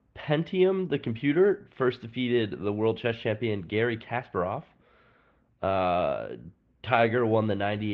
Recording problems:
muffled; very; fading above 3 kHz
garbled, watery; slightly
abrupt cut into speech; at the end

